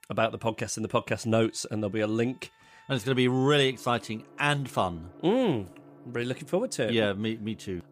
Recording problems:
background music; faint; throughout; 25 dB below the speech

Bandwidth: 15 kHz